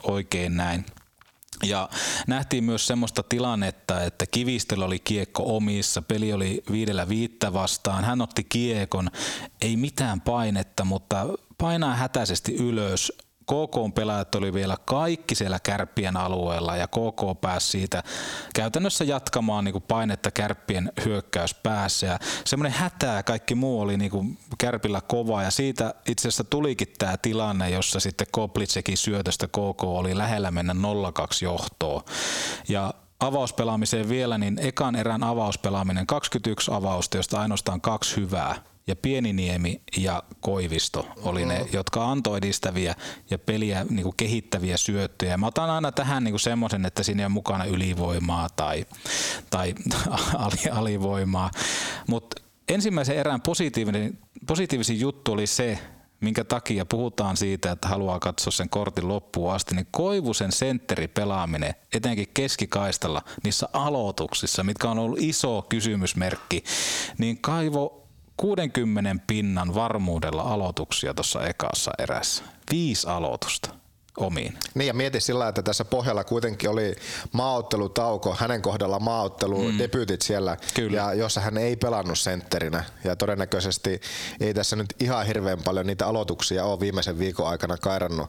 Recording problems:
squashed, flat; heavily

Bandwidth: 18.5 kHz